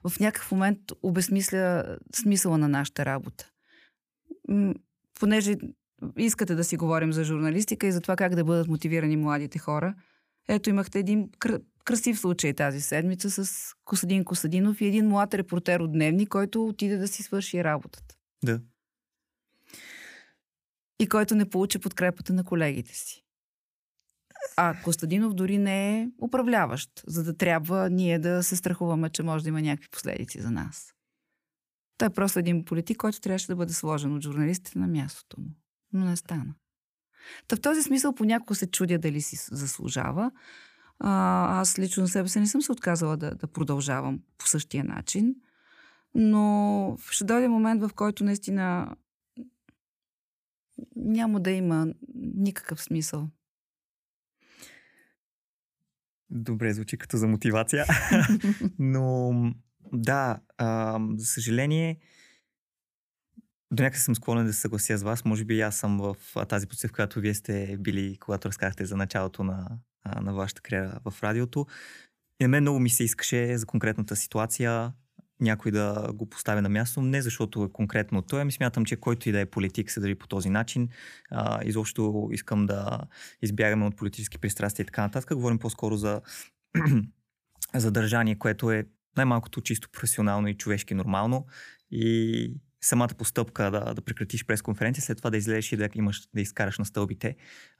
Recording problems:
none

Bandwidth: 15 kHz